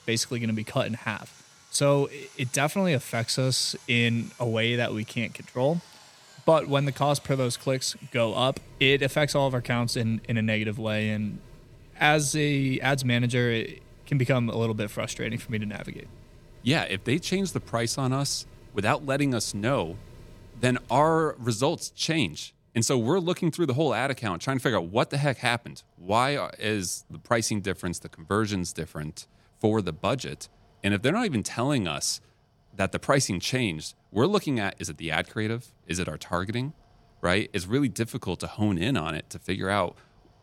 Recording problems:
machinery noise; faint; throughout; 25 dB below the speech

